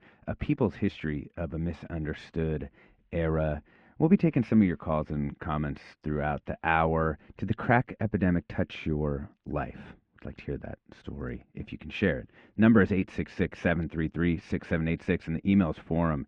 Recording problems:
muffled; very; fading above 2.5 kHz

